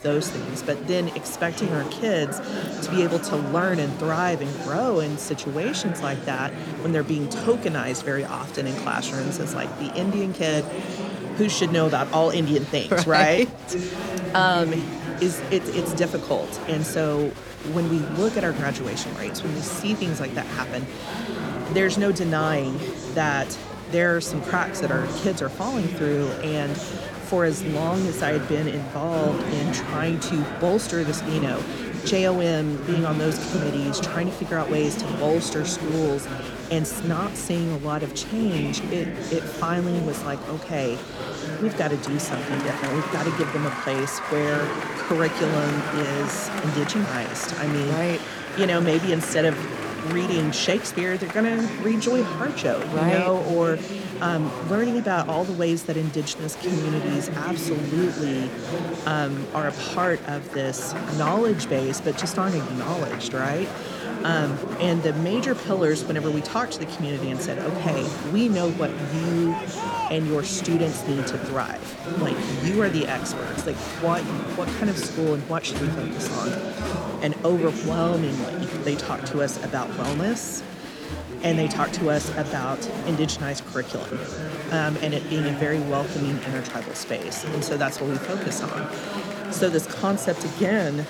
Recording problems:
murmuring crowd; loud; throughout; 6 dB below the speech

